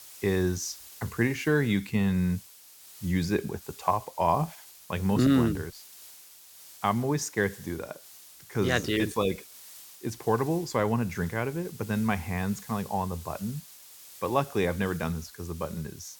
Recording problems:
hiss; noticeable; throughout; 15 dB below the speech

